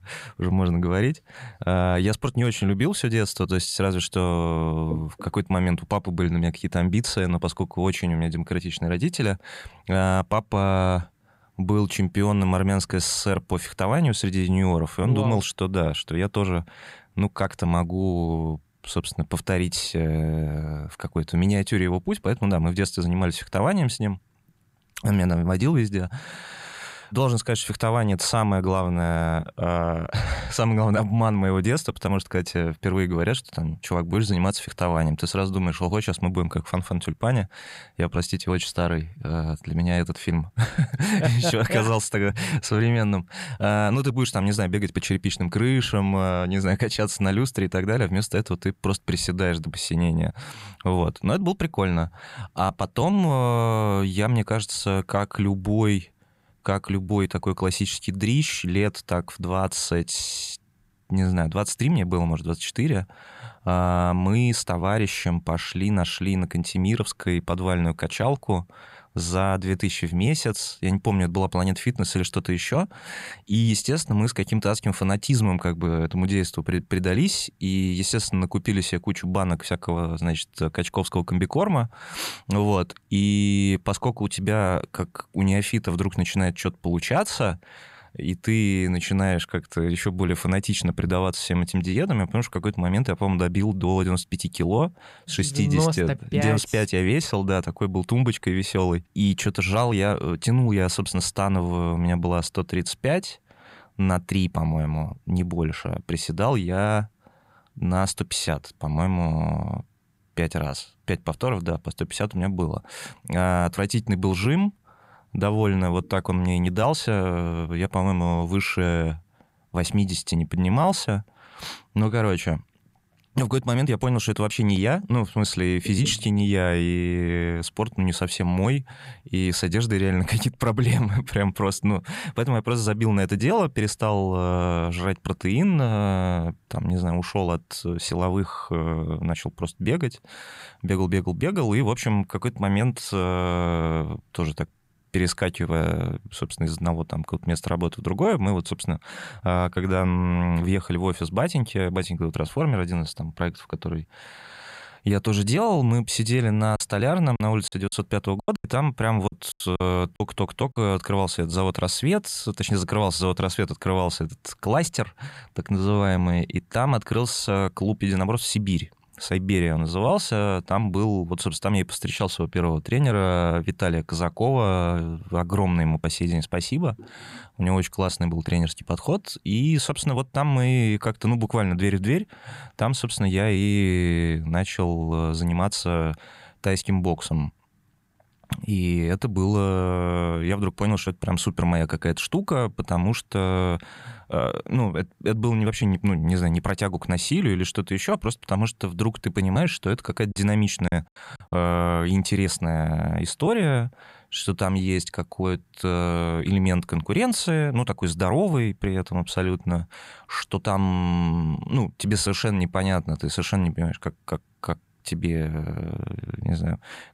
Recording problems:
choppy; very; from 2:37 to 2:41 and from 3:20 to 3:22; 12% of the speech affected

